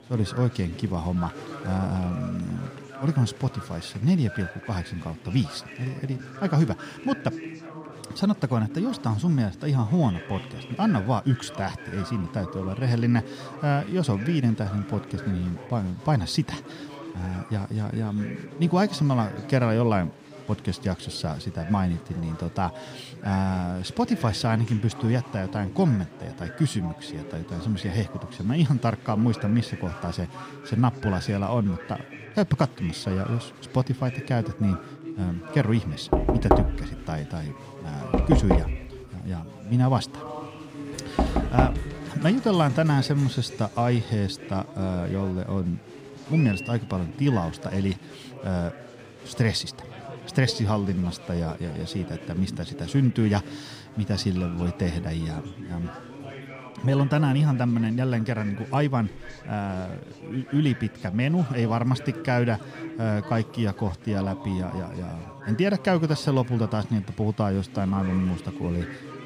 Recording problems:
chatter from many people; noticeable; throughout; 15 dB below the speech
door banging; loud; from 36 to 42 s; peak 5 dB above the speech

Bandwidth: 15.5 kHz